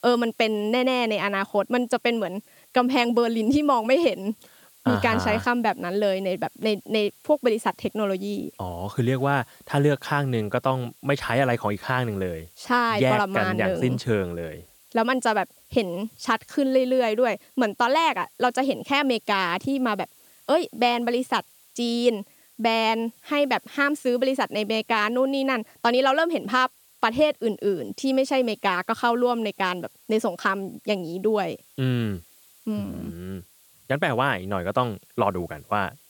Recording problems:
hiss; faint; throughout; 30 dB below the speech

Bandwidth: 18.5 kHz